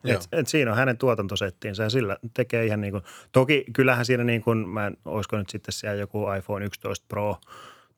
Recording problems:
none

